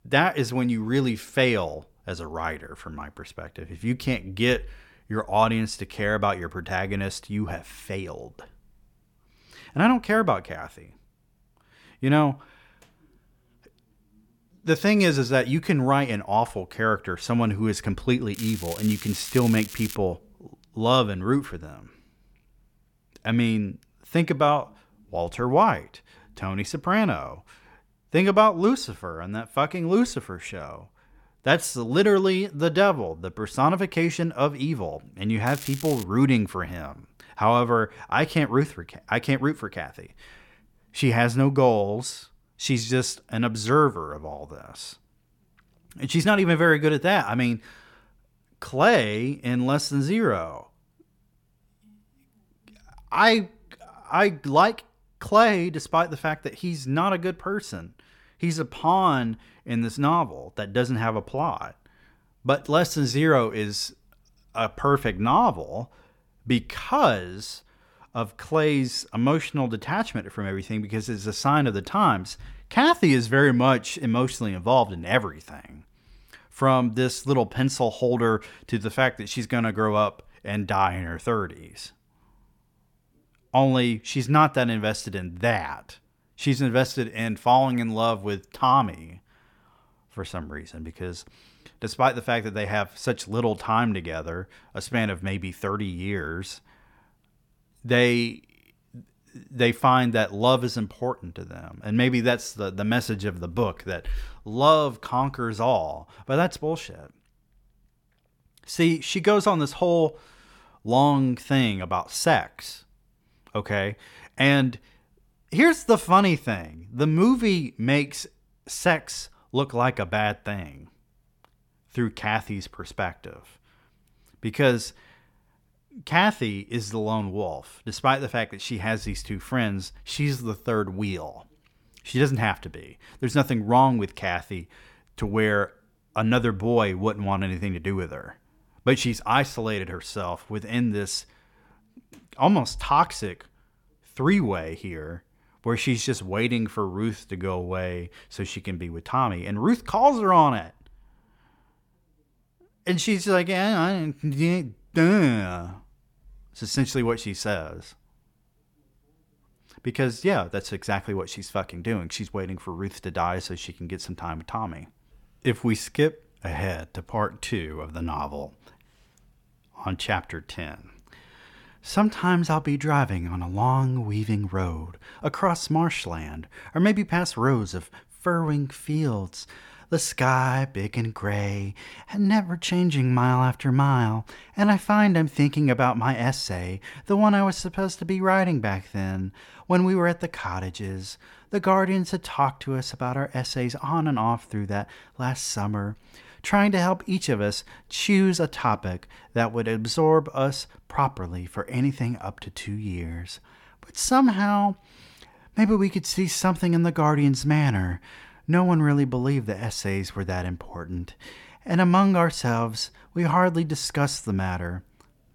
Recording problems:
crackling; noticeable; from 18 to 20 s and at 35 s; 15 dB below the speech

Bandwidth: 17.5 kHz